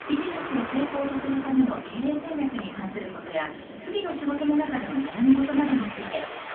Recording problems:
phone-call audio; poor line; nothing above 3.5 kHz
off-mic speech; far
echo of what is said; faint; throughout; 450 ms later, 25 dB below the speech
room echo; very slight; dies away in 0.3 s
rain or running water; noticeable; throughout; 10 dB below the speech
train or aircraft noise; noticeable; until 3.5 s; 10 dB below the speech

